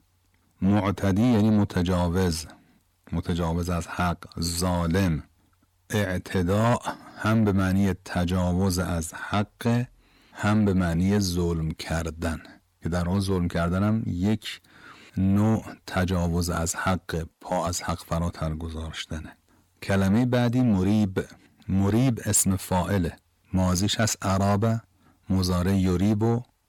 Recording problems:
distortion; slight; 10 dB below the speech

